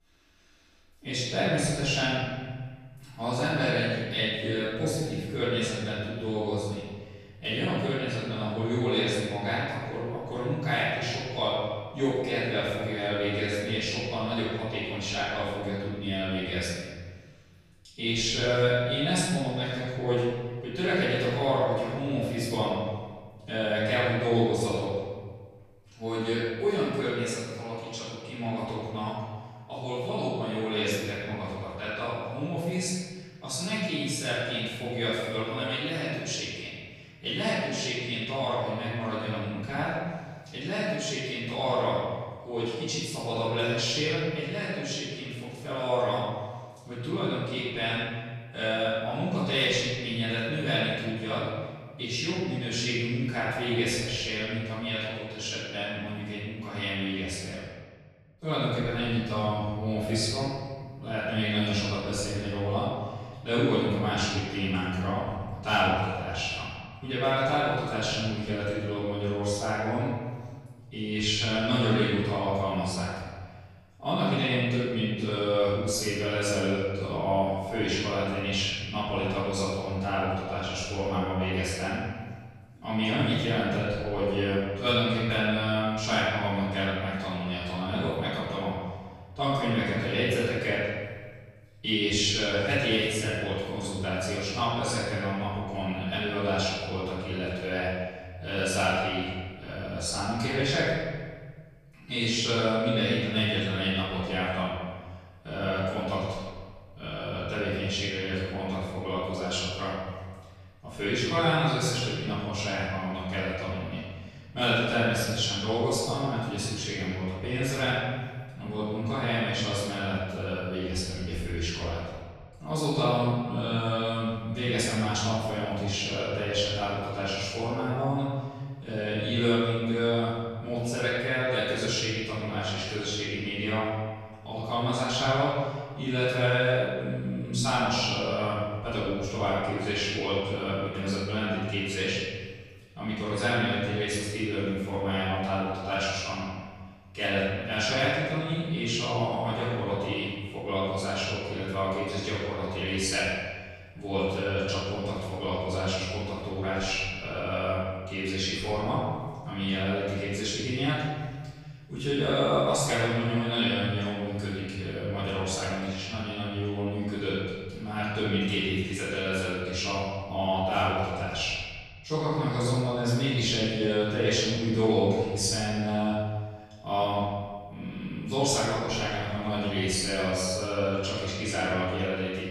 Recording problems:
room echo; strong; dies away in 1.5 s
off-mic speech; far

